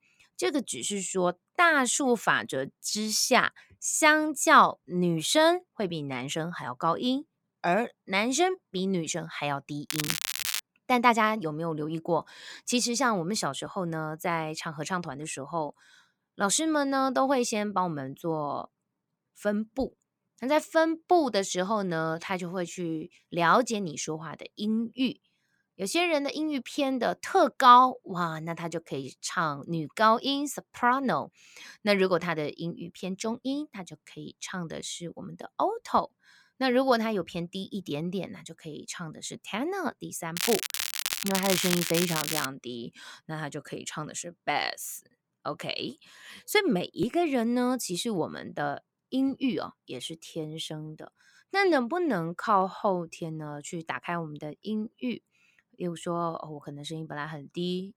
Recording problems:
crackling; loud; at 10 s and from 40 to 42 s; 1 dB below the speech

